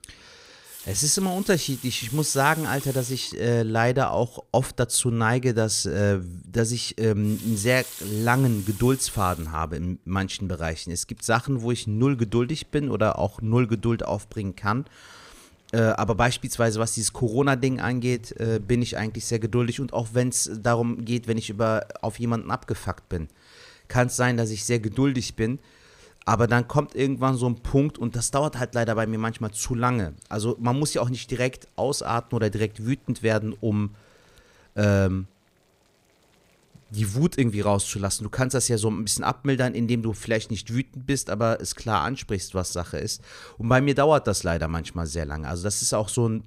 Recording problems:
household noises; noticeable; throughout; 15 dB below the speech

